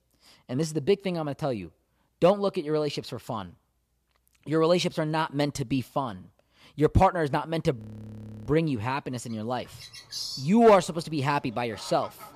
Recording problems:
animal sounds; noticeable; from 10 s on; 10 dB below the speech
audio freezing; at 8 s for 0.5 s

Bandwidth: 14.5 kHz